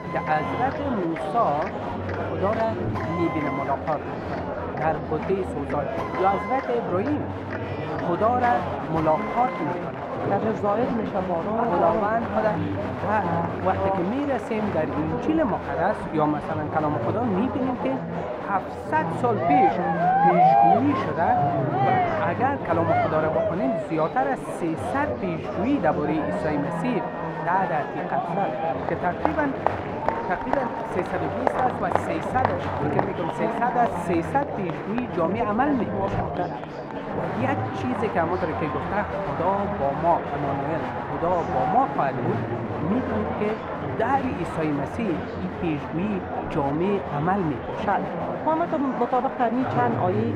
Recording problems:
muffled; very; fading above 3.5 kHz
machinery noise; loud; throughout; 9 dB below the speech
murmuring crowd; loud; throughout; 1 dB below the speech

